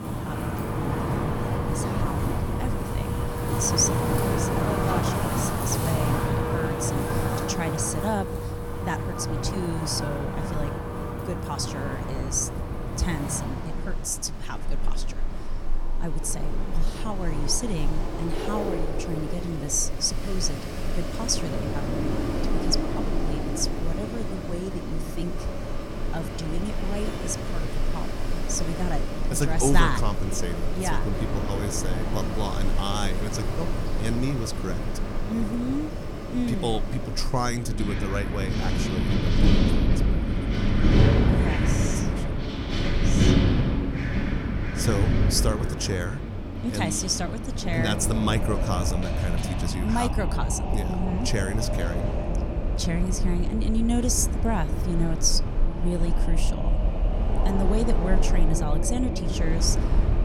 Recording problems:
wind in the background; very loud; throughout; 2 dB above the speech

